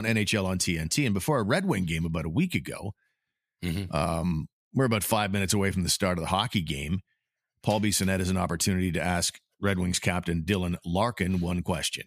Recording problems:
abrupt cut into speech; at the start

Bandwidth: 14.5 kHz